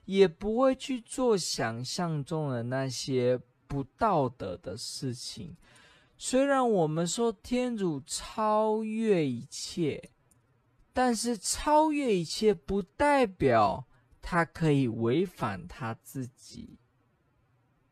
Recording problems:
wrong speed, natural pitch; too slow; 0.6 times normal speed

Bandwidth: 14 kHz